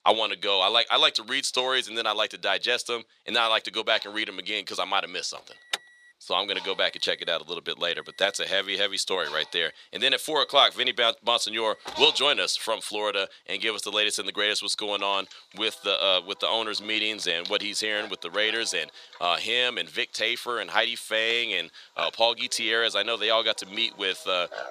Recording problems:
thin; very; fading below 650 Hz
animal sounds; faint; throughout; 20 dB below the speech
alarm; noticeable; from 5.5 to 12 s; peak 8 dB below the speech

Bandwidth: 14.5 kHz